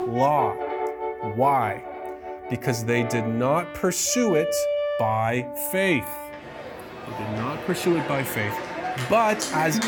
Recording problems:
background music; loud; throughout; 7 dB below the speech

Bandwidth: 18 kHz